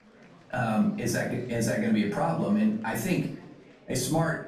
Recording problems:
off-mic speech; far
room echo; slight; dies away in 0.4 s
murmuring crowd; faint; throughout; 25 dB below the speech

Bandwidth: 14.5 kHz